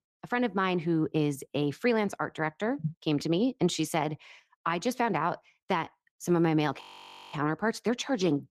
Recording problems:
garbled, watery; slightly; nothing above 14.5 kHz
audio freezing; at 7 s for 0.5 s

